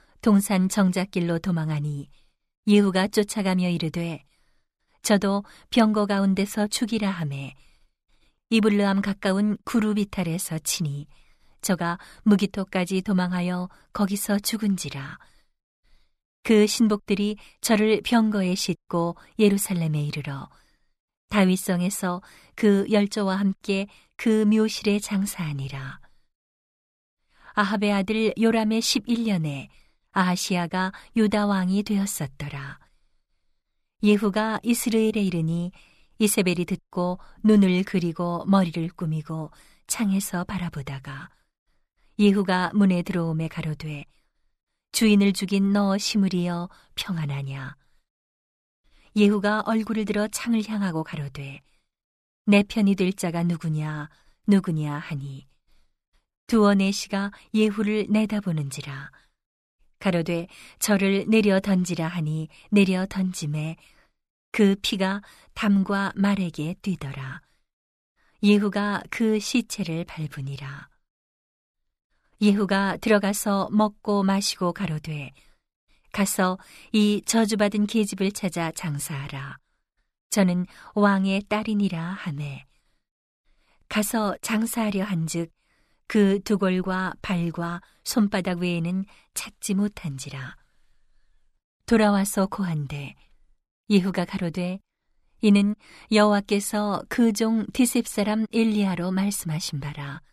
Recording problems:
none

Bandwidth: 14.5 kHz